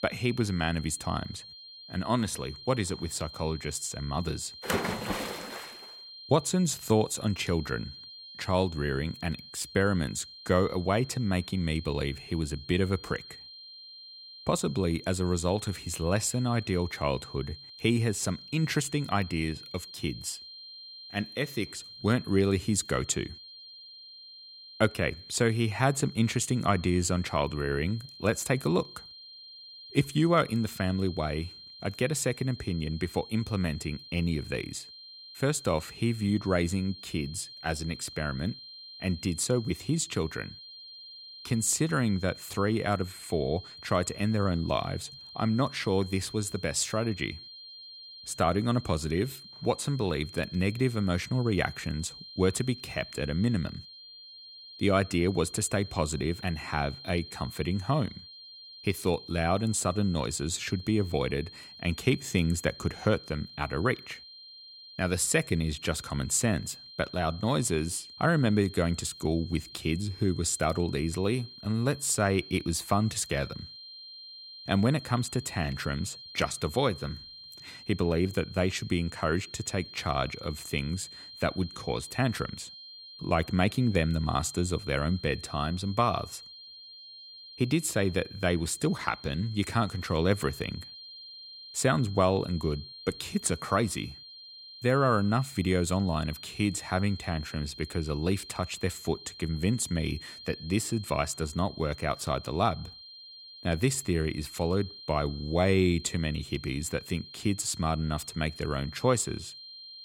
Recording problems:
high-pitched whine; noticeable; throughout; 4 kHz, 15 dB below the speech

